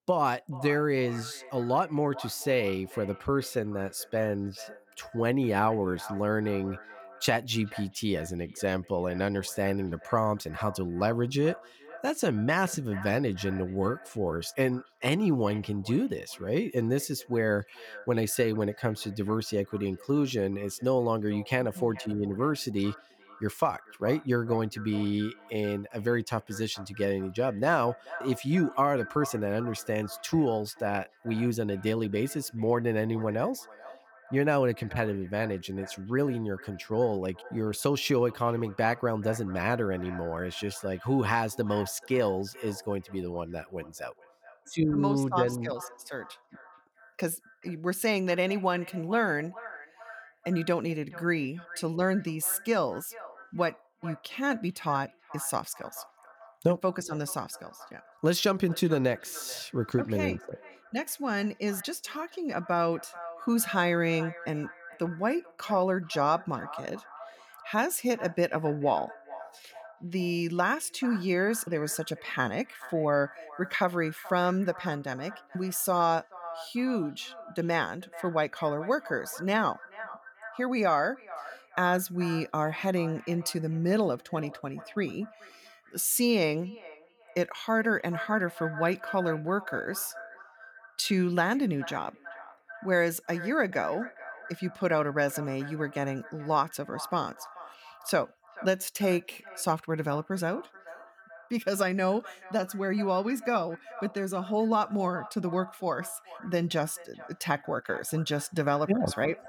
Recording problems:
echo of what is said; noticeable; throughout; 430 ms later, 15 dB below the speech

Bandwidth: 18.5 kHz